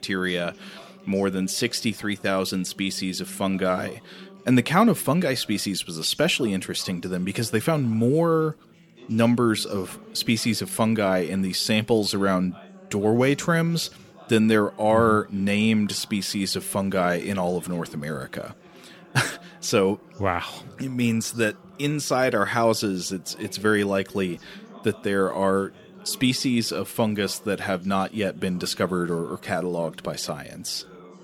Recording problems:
background chatter; faint; throughout; 3 voices, 25 dB below the speech

